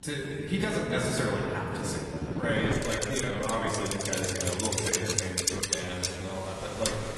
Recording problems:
off-mic speech; far
room echo; noticeable; dies away in 2.2 s
garbled, watery; slightly; nothing above 11.5 kHz
traffic noise; loud; throughout; 1 dB below the speech
wind noise on the microphone; faint; 15 dB below the speech
uneven, jittery; strongly; from 2 to 6.5 s

